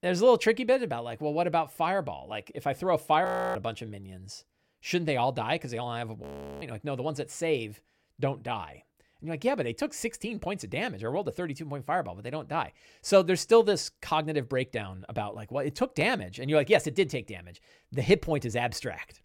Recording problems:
audio freezing; at 3.5 s and at 6 s

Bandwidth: 16.5 kHz